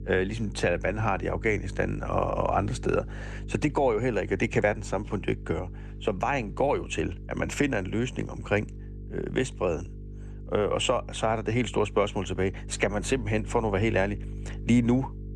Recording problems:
electrical hum; faint; throughout; 50 Hz, 25 dB below the speech

